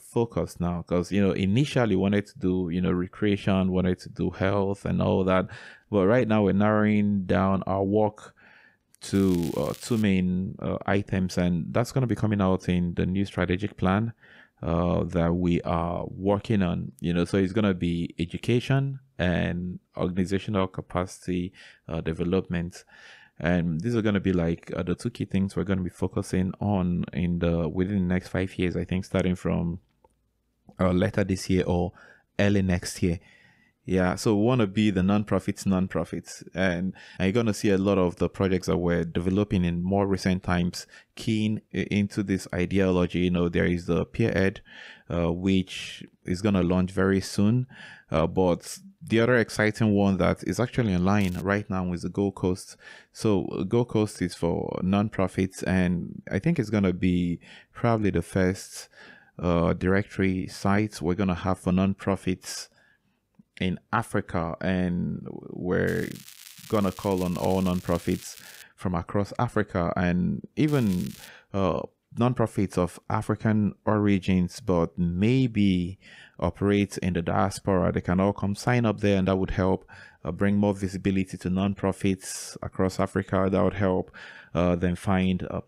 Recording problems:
crackling; noticeable; 4 times, first at 9 s; 20 dB below the speech

